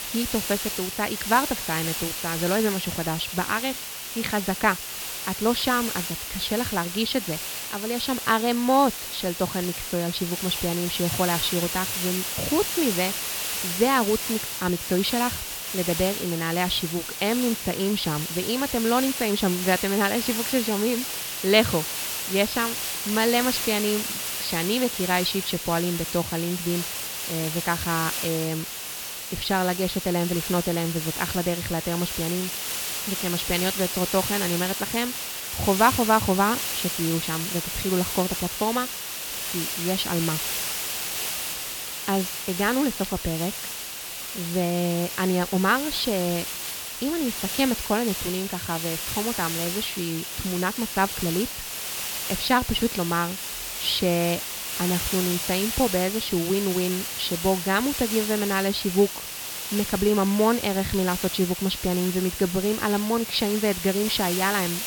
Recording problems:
high frequencies cut off; noticeable; nothing above 5.5 kHz
hiss; loud; throughout; 3 dB below the speech
crackle, like an old record; very faint; 25 dB below the speech

